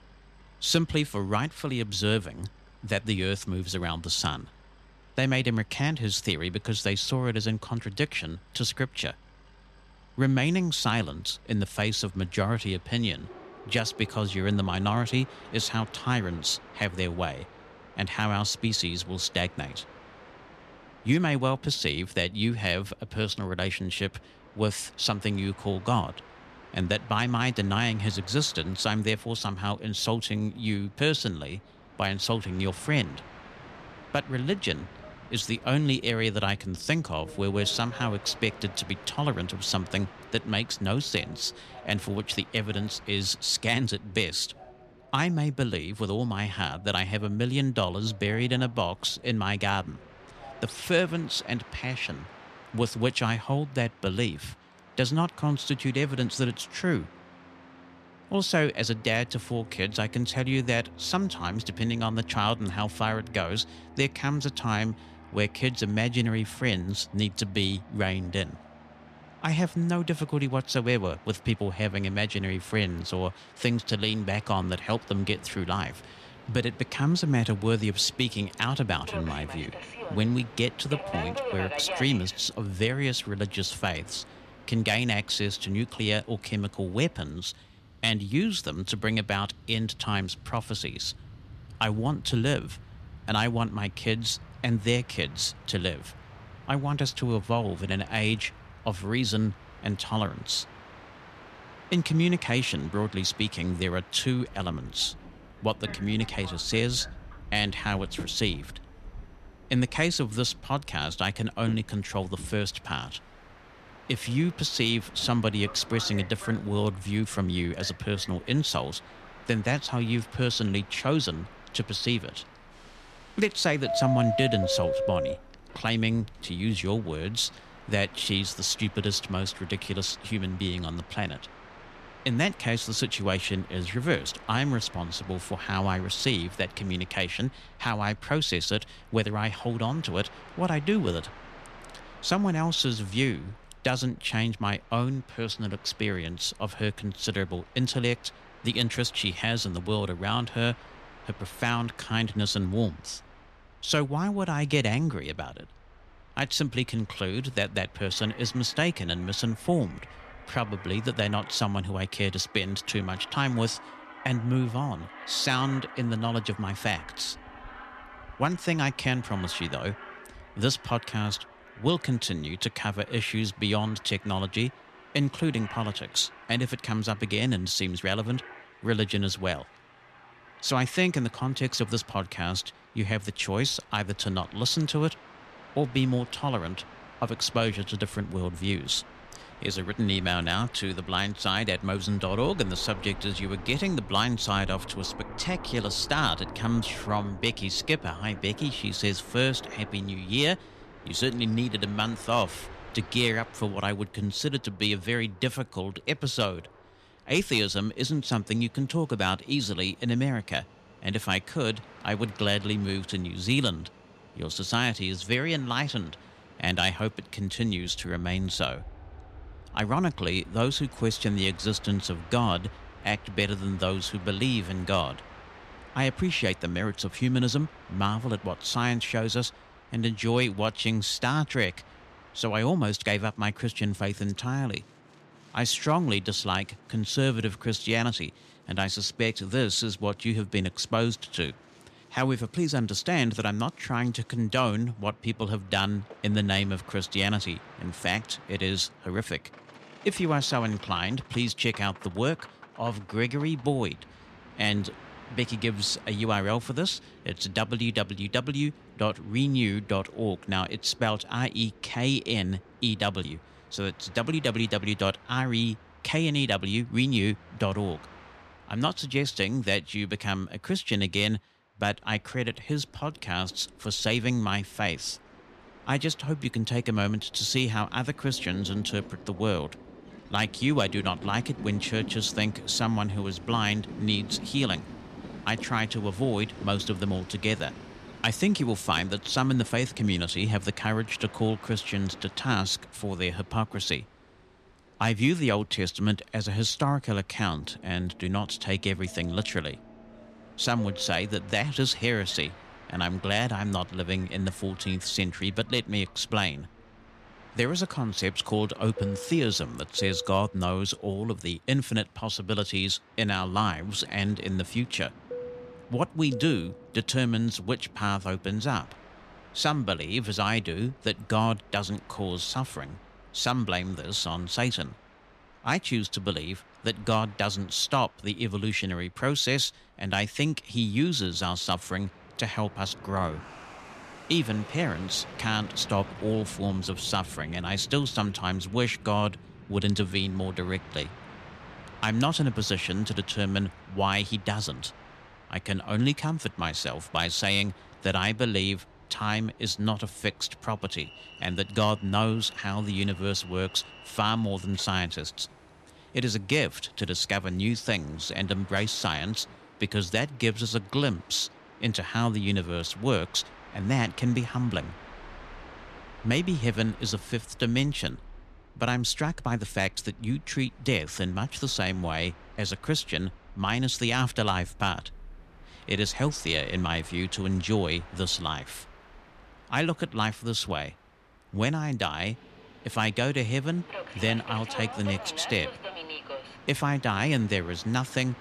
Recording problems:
train or aircraft noise; noticeable; throughout; 20 dB below the speech

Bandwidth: 13.5 kHz